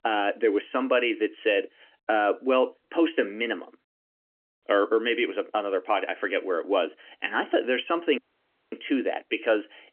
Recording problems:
phone-call audio; nothing above 3 kHz
audio cutting out; at 8 s for 0.5 s

